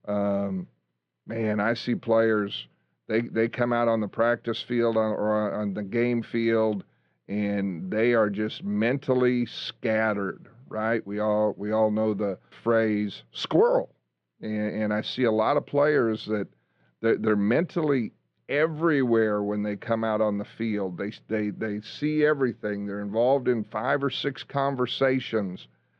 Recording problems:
muffled; slightly; fading above 3.5 kHz

